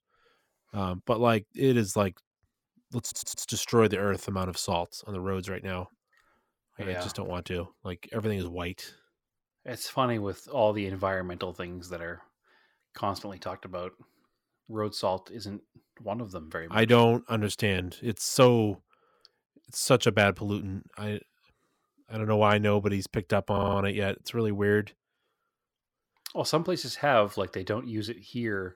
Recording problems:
audio stuttering; at 3 s and at 24 s

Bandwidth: 17.5 kHz